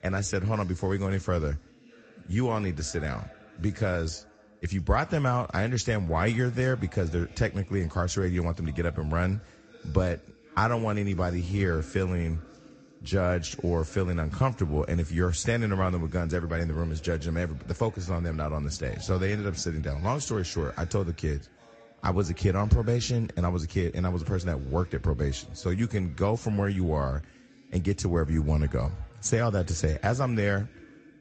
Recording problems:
garbled, watery; slightly; nothing above 8 kHz
background chatter; faint; throughout; 3 voices, 25 dB below the speech

